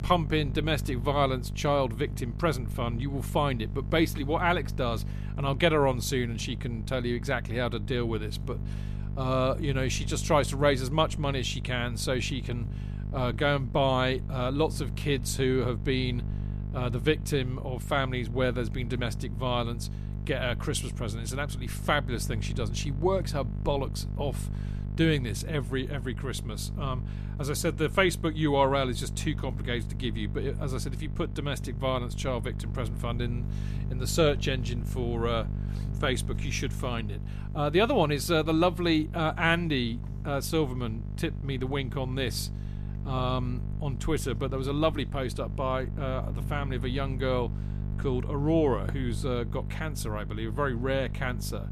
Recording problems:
electrical hum; noticeable; throughout; 50 Hz, 15 dB below the speech

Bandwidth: 14.5 kHz